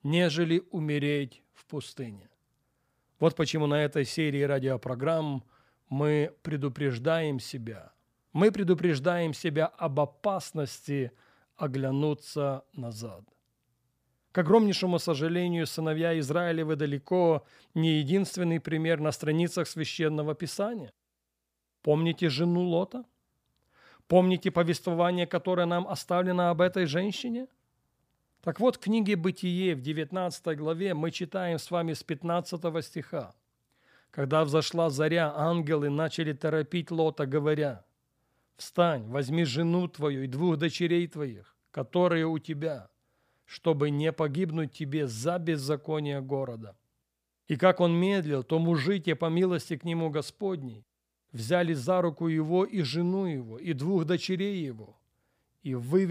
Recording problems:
abrupt cut into speech; at the end

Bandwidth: 15 kHz